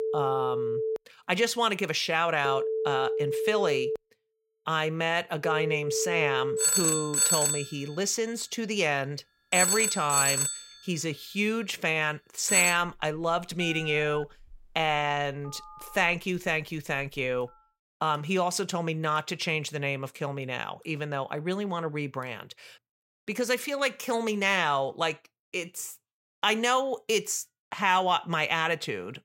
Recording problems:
alarms or sirens; very loud; until 17 s; 2 dB above the speech

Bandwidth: 16 kHz